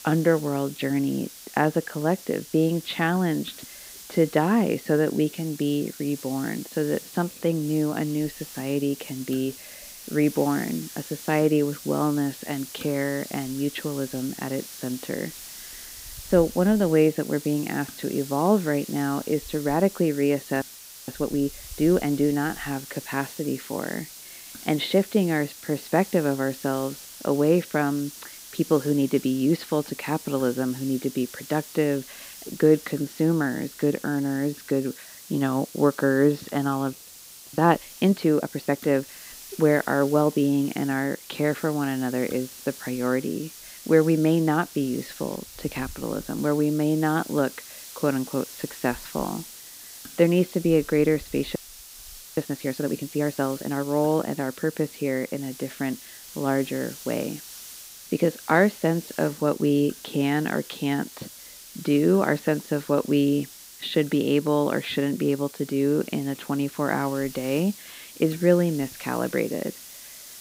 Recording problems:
muffled; slightly; fading above 4 kHz
hiss; noticeable; throughout; 15 dB below the speech
audio freezing; at 21 s, at 37 s for 0.5 s and at 52 s for 1 s

